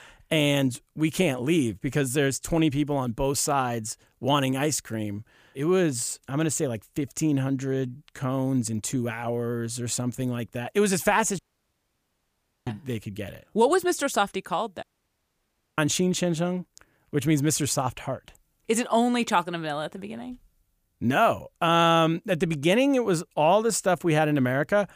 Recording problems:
audio cutting out; at 11 s for 1.5 s and at 15 s for 1 s

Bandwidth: 15 kHz